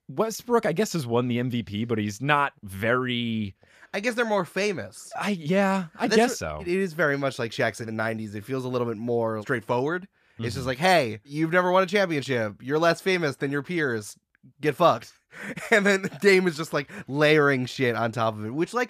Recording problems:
none

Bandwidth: 14.5 kHz